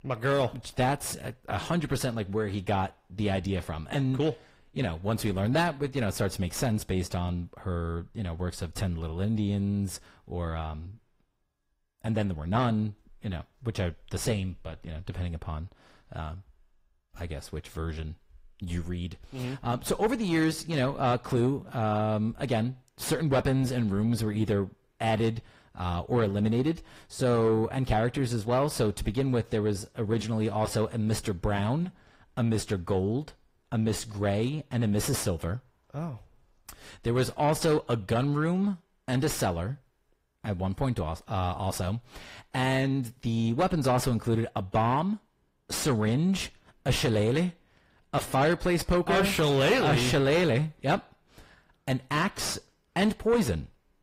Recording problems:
distortion; slight; 10 dB below the speech
garbled, watery; slightly; nothing above 15.5 kHz

